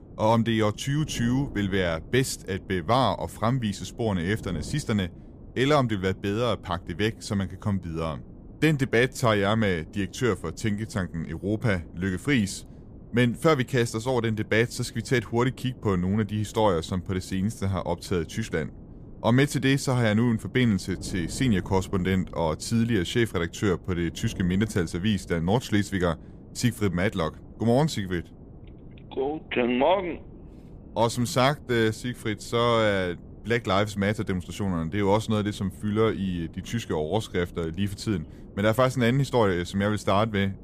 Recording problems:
wind noise on the microphone; occasional gusts; 25 dB below the speech

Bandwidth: 15 kHz